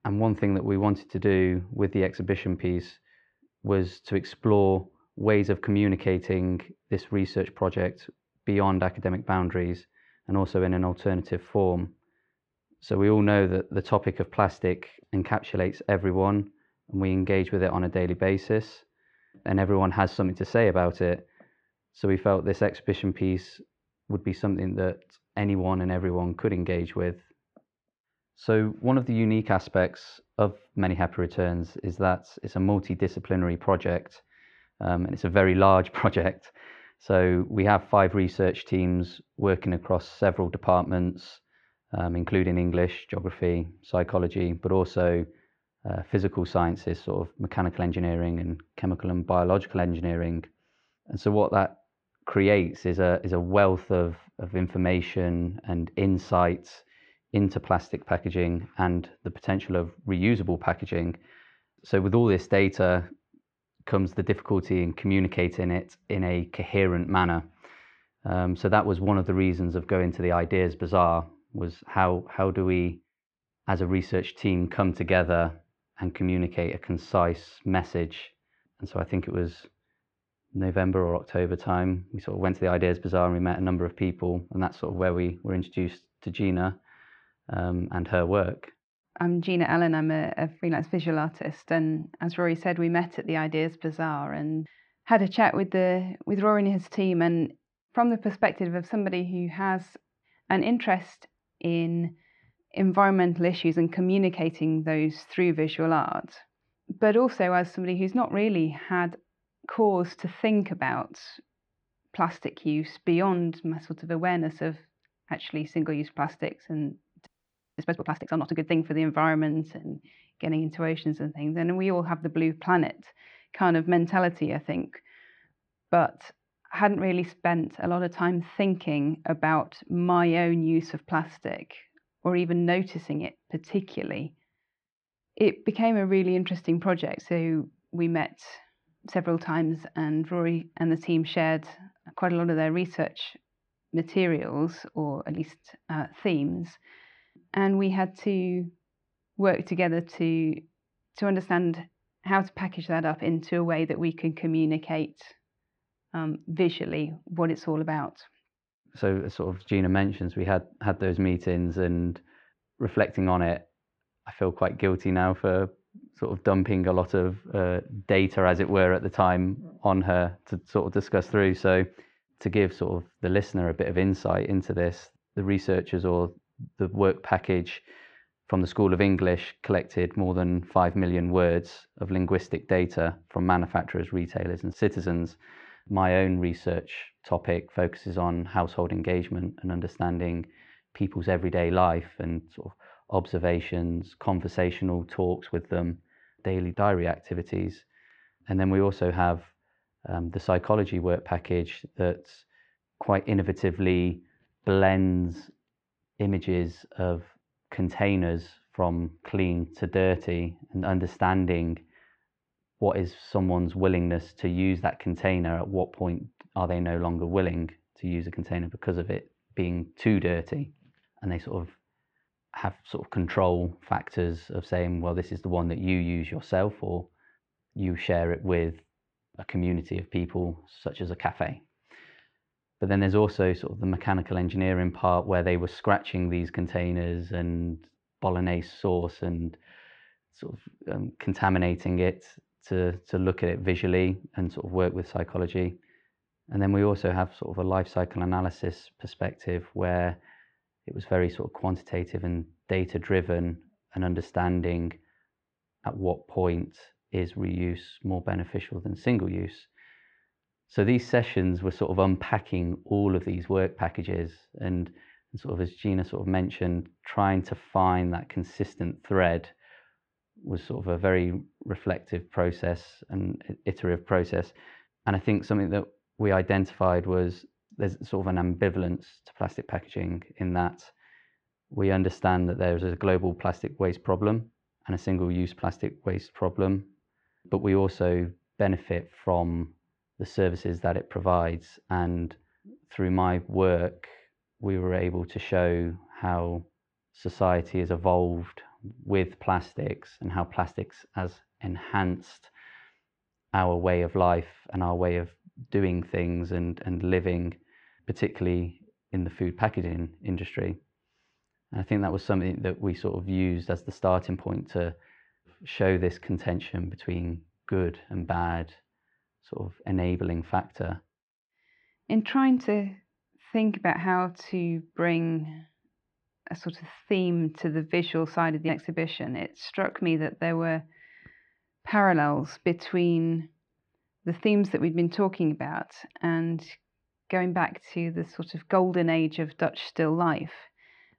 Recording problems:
muffled; very; fading above 2.5 kHz
audio freezing; at 1:57 for 0.5 s

